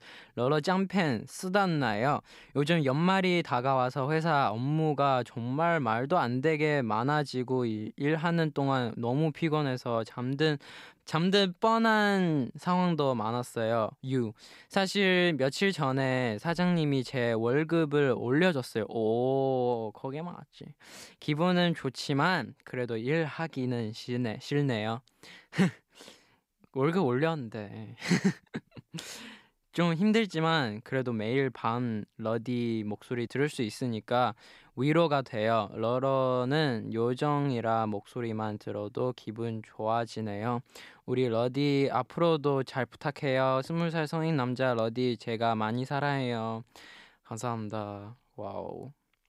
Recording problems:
none

